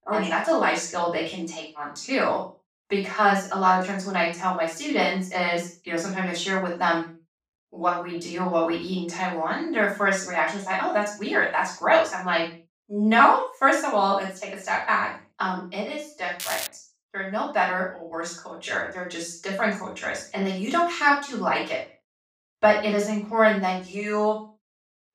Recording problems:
off-mic speech; far
room echo; noticeable; dies away in 0.3 s
crackling; loud; at 16 s; 8 dB below the speech

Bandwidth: 15.5 kHz